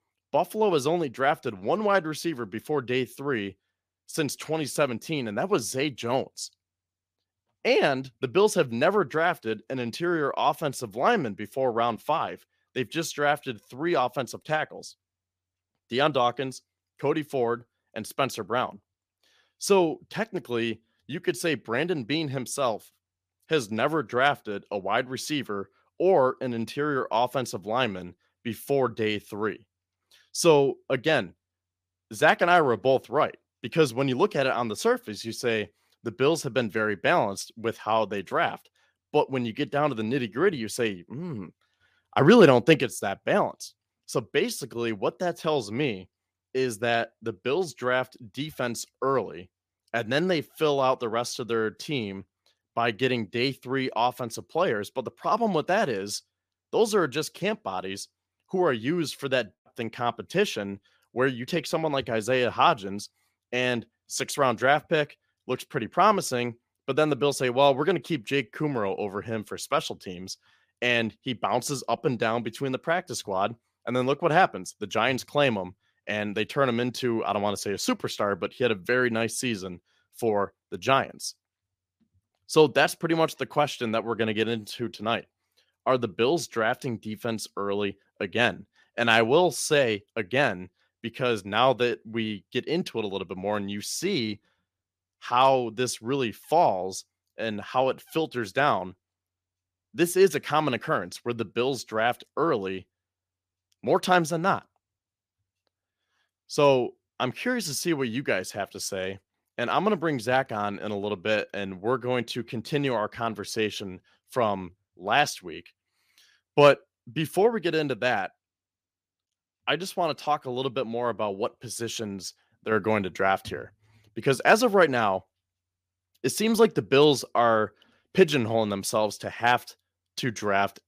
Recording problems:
none

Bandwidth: 15 kHz